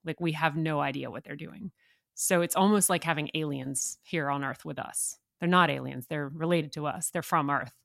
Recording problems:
none

